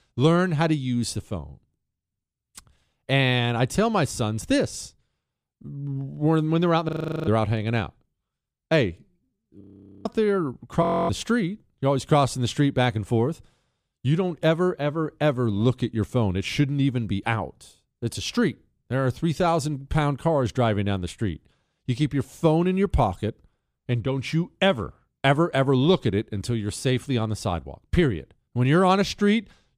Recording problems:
audio freezing; at 7 s, at 9.5 s and at 11 s

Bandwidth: 15 kHz